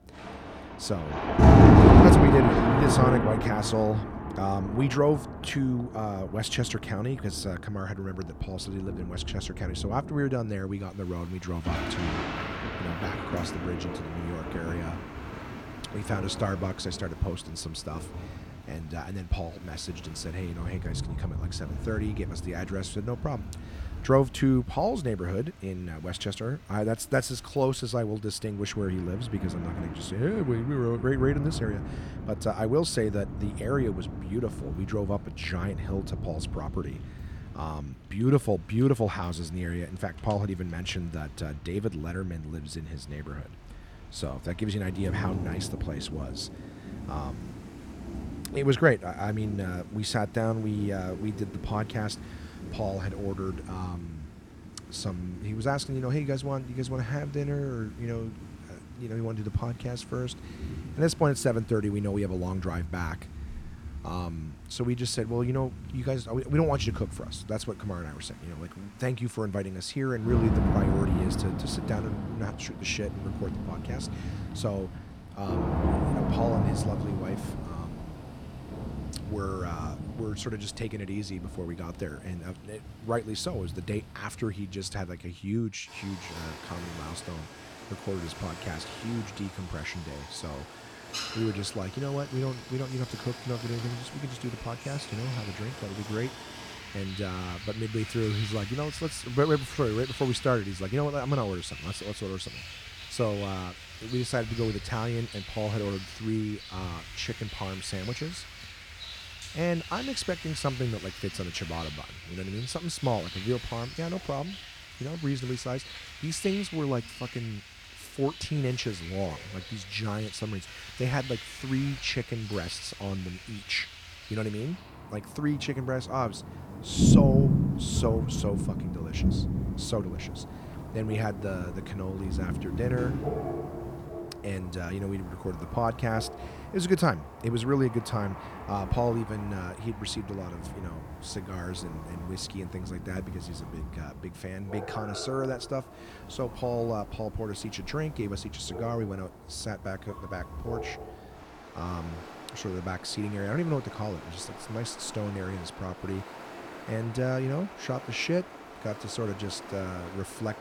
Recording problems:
rain or running water; very loud; throughout; as loud as the speech

